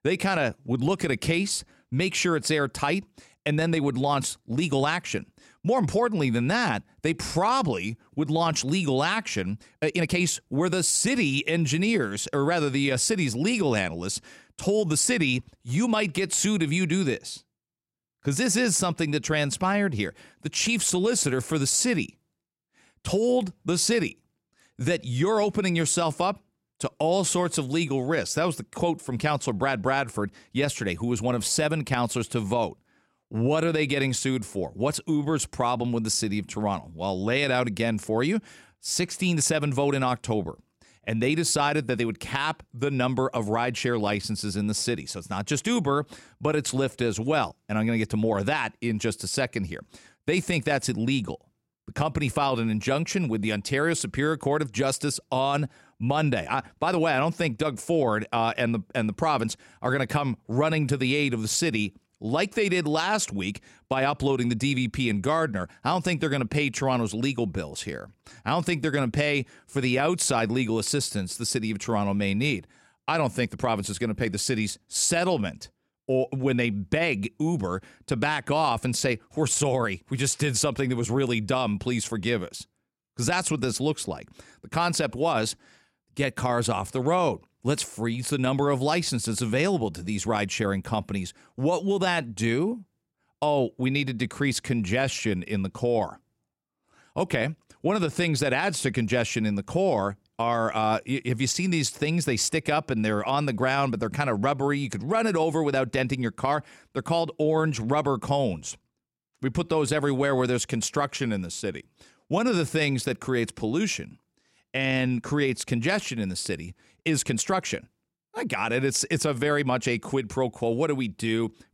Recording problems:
uneven, jittery; strongly; from 7.5 s to 1:58

